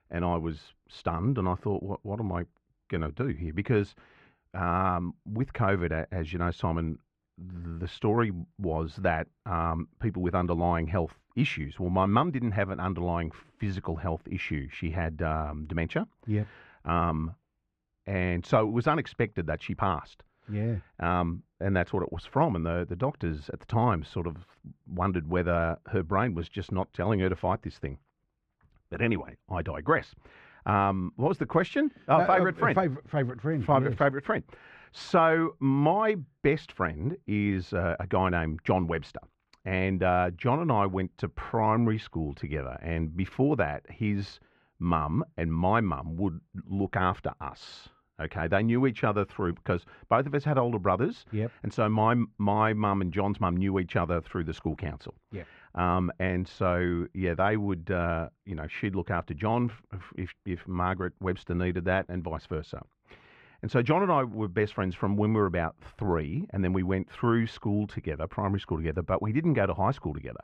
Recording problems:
muffled; very; fading above 2 kHz

